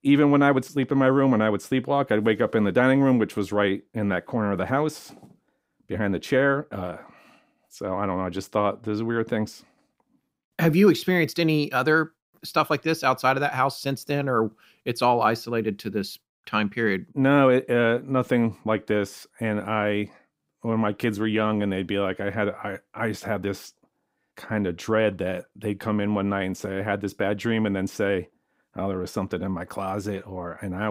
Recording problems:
abrupt cut into speech; at the end

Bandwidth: 15.5 kHz